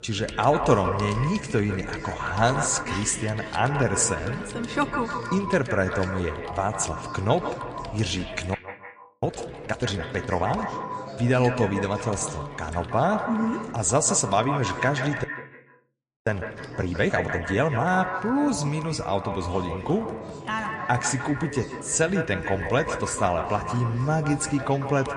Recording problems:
echo of what is said; strong; throughout; 150 ms later, 8 dB below the speech
garbled, watery; slightly; nothing above 9 kHz
chatter from many people; noticeable; throughout; 15 dB below the speech
household noises; faint; throughout; 20 dB below the speech
audio freezing; at 8.5 s for 0.5 s and at 15 s for 1 s

